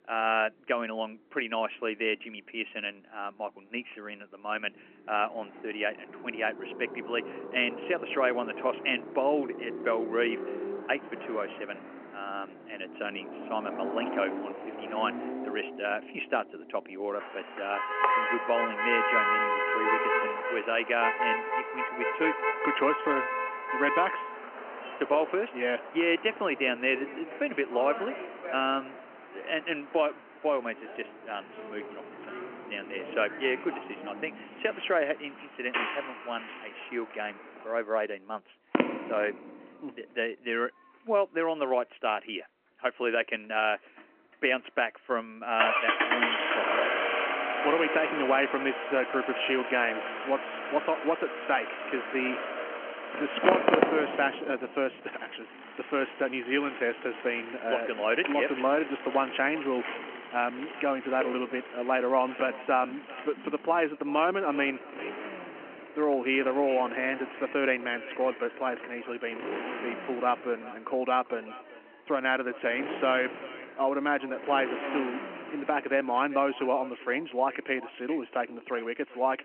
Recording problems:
echo of what is said; noticeable; from 58 s on; 390 ms later, 15 dB below the speech
phone-call audio; nothing above 3 kHz
traffic noise; loud; throughout; 3 dB below the speech

